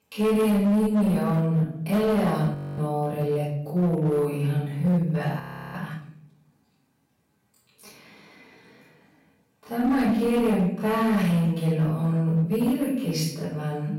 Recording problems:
off-mic speech; far
wrong speed, natural pitch; too slow; 0.5 times normal speed
room echo; noticeable; dies away in 0.7 s
distortion; slight; 10% of the sound clipped
audio freezing; at 2.5 s and at 5.5 s

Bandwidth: 16 kHz